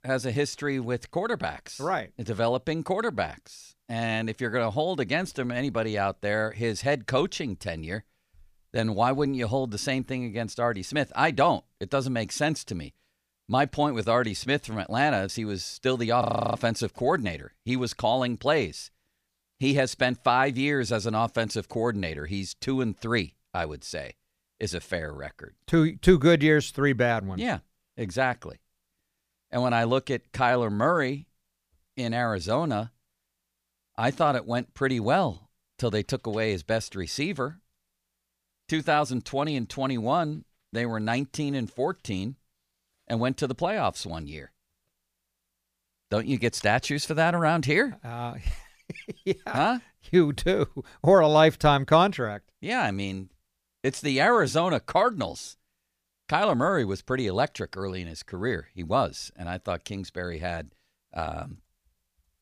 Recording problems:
audio freezing; at 16 s

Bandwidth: 15 kHz